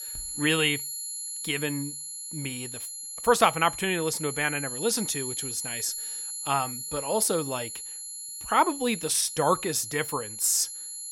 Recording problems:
high-pitched whine; loud; throughout; 11 kHz, 7 dB below the speech

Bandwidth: 16 kHz